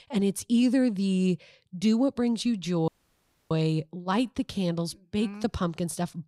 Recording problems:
audio cutting out; at 3 s for 0.5 s

